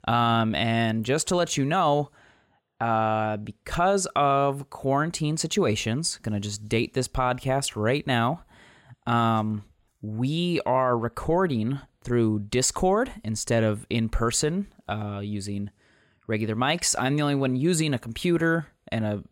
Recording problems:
none

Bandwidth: 16 kHz